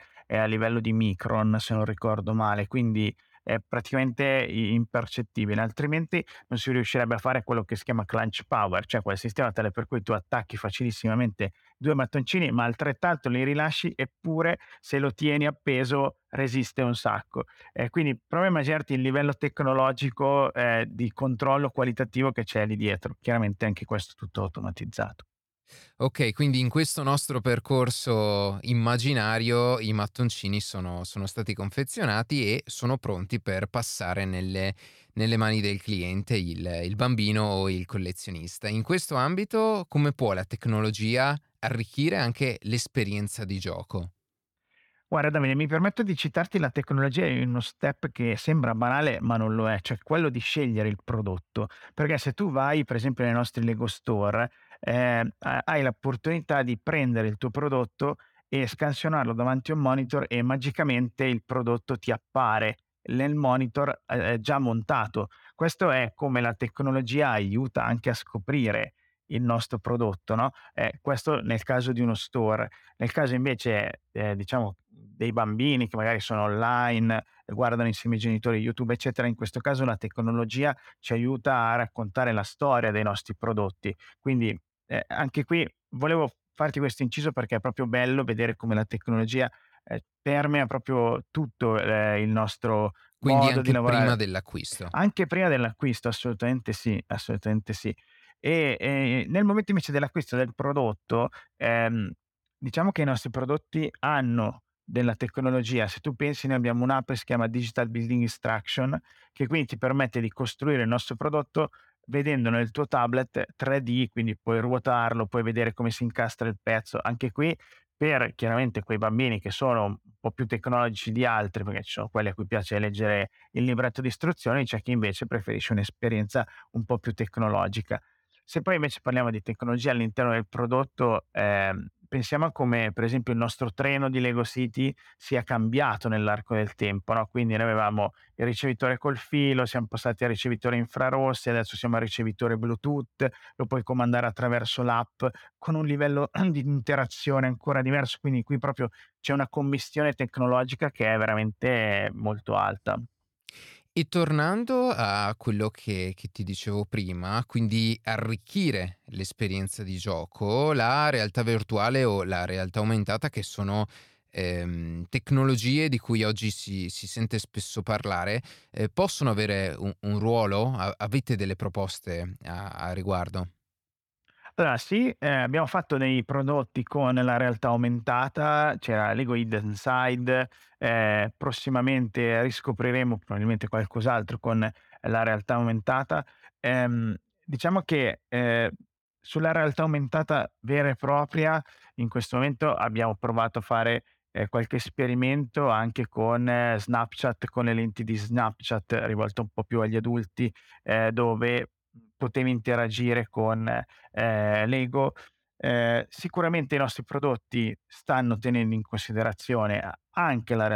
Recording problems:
abrupt cut into speech; at the end

